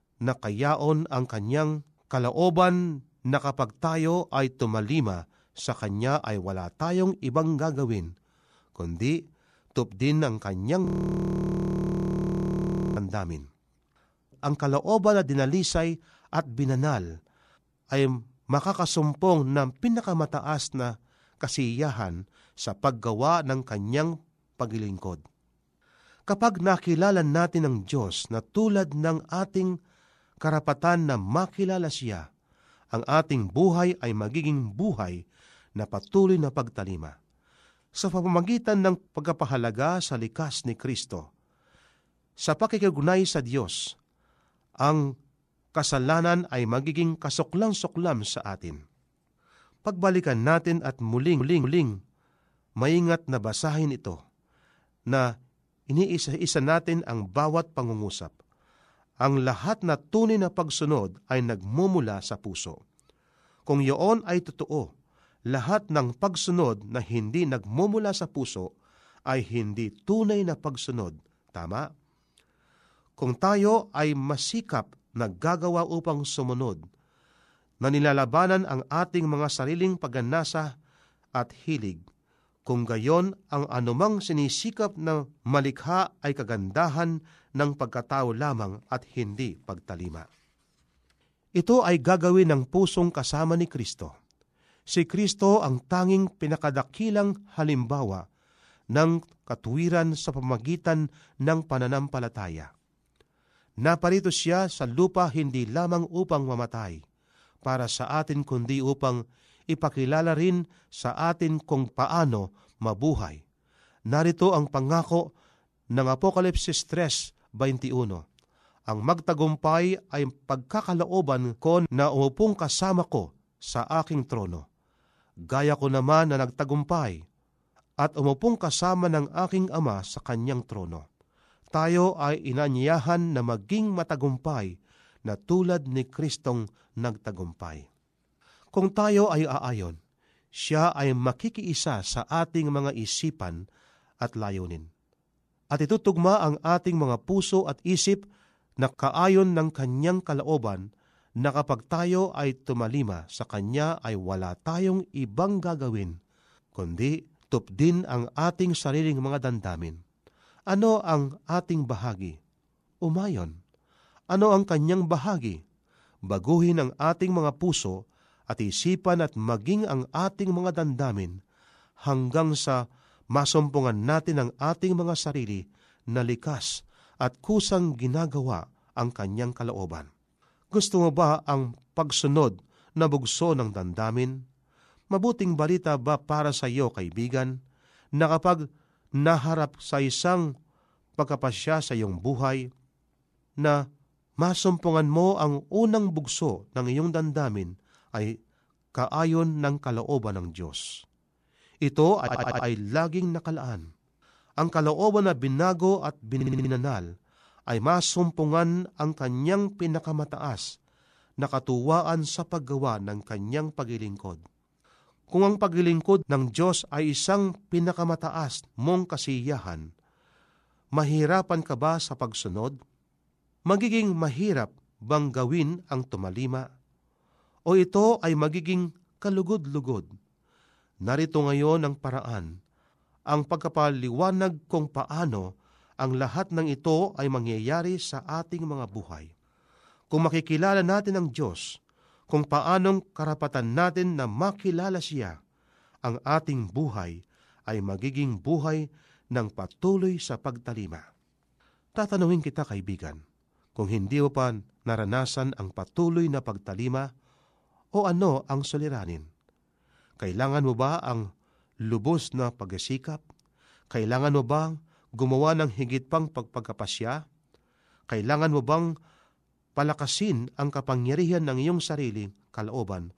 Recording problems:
audio freezing; at 11 s for 2 s
audio stuttering; at 51 s, at 3:22 and at 3:26

